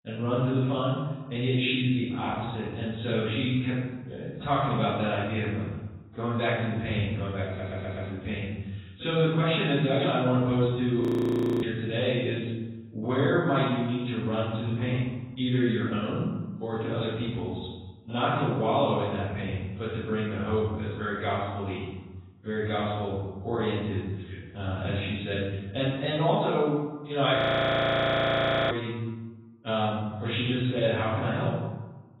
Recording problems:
off-mic speech; far
garbled, watery; badly; nothing above 4 kHz
room echo; noticeable; dies away in 1 s
audio stuttering; at 7.5 s
audio freezing; at 11 s for 0.5 s and at 27 s for 1.5 s

